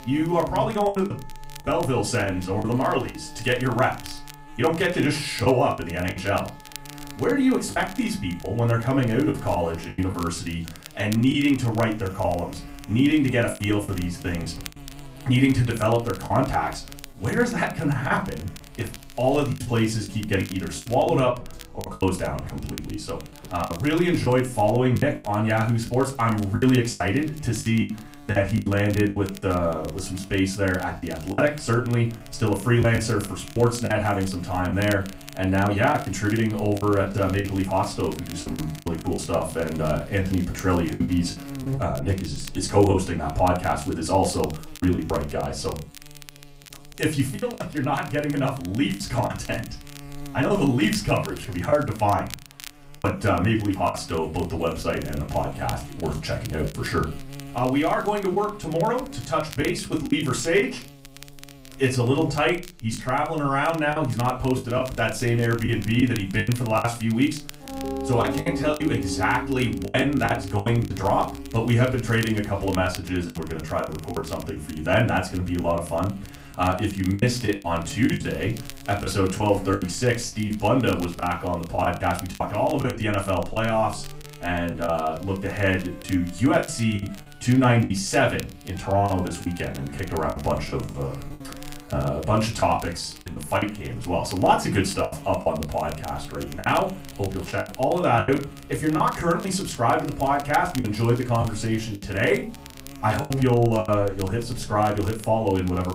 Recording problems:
off-mic speech; far
room echo; very slight; dies away in 0.3 s
background music; noticeable; throughout; 20 dB below the speech
electrical hum; faint; throughout; 60 Hz, 20 dB below the speech
crackle, like an old record; faint; 20 dB below the speech
choppy; very; 8% of the speech affected

